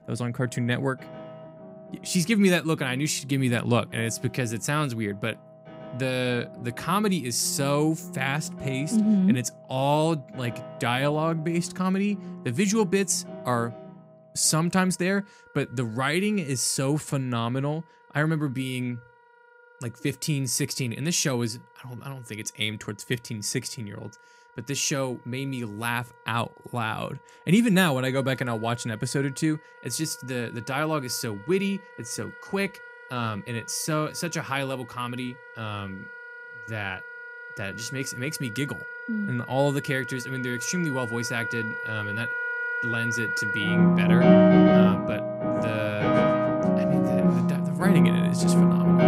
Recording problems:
background music; very loud; throughout; 3 dB above the speech

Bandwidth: 15.5 kHz